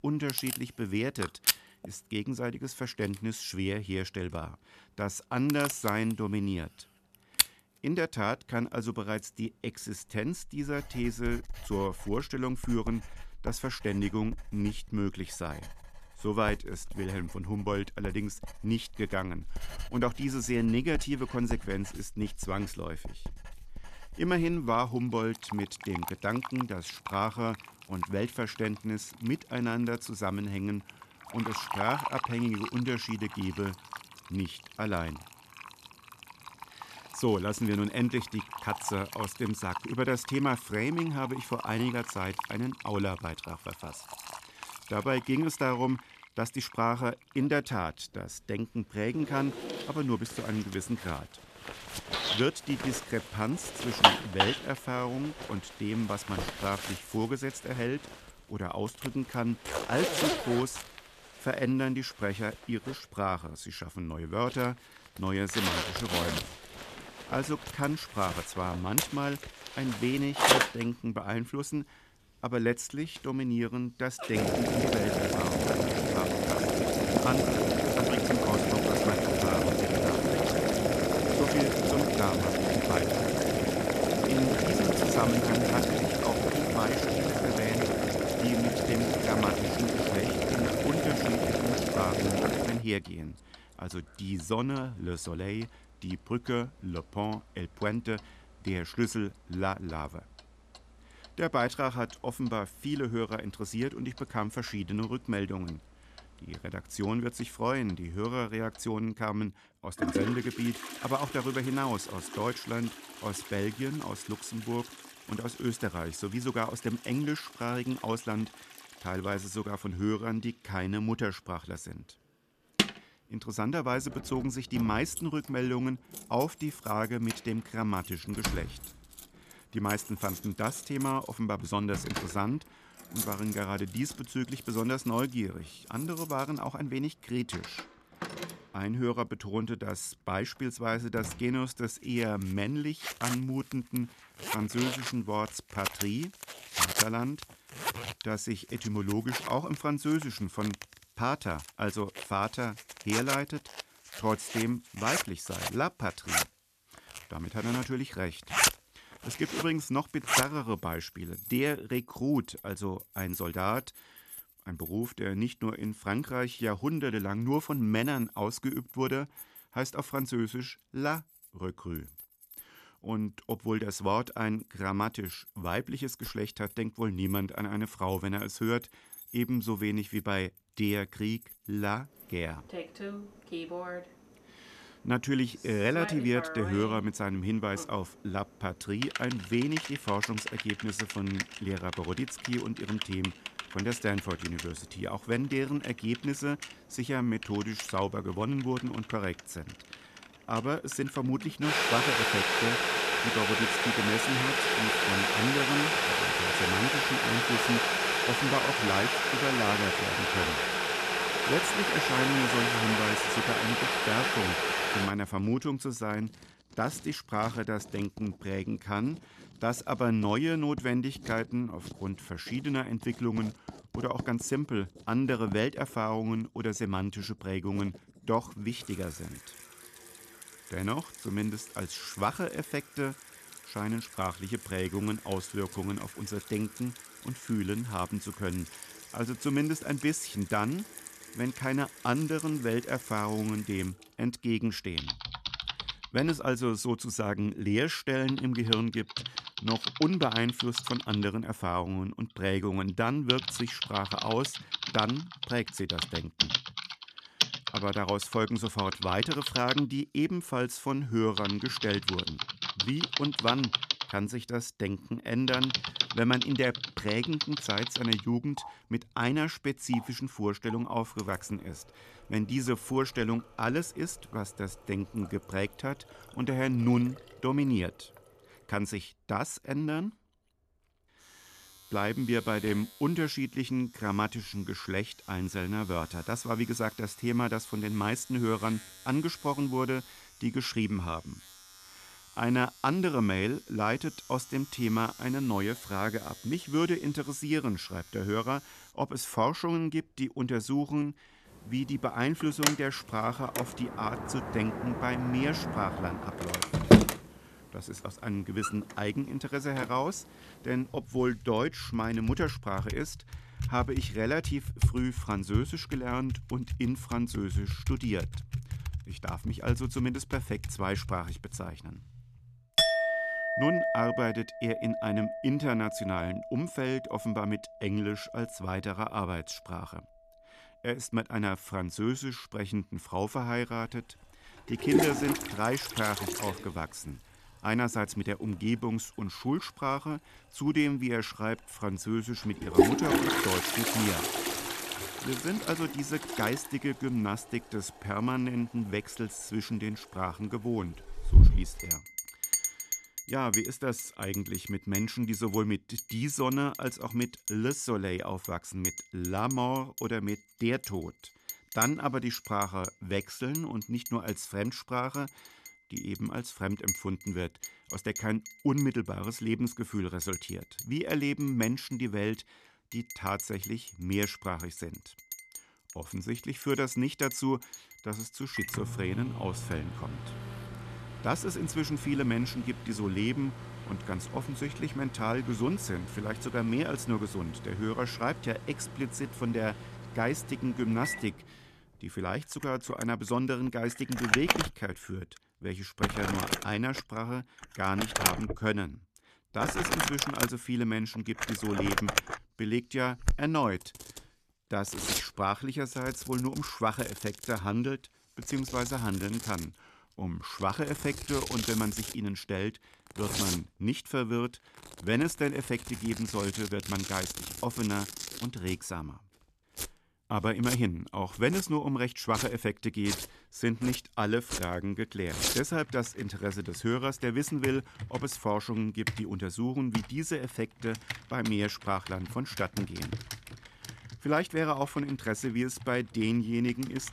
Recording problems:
household noises; very loud; throughout; as loud as the speech

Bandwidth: 14 kHz